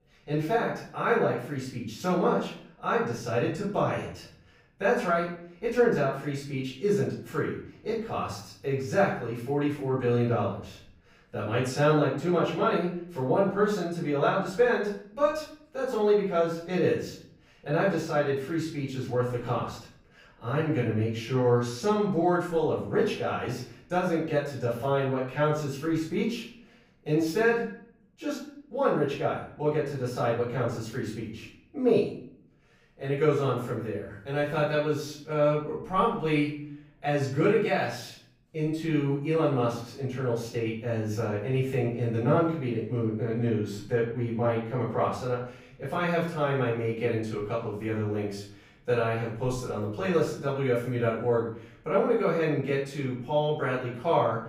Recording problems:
off-mic speech; far
room echo; noticeable; dies away in 0.5 s

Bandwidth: 15.5 kHz